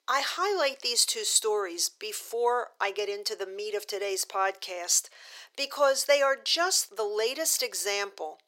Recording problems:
thin; very; fading below 400 Hz

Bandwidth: 16 kHz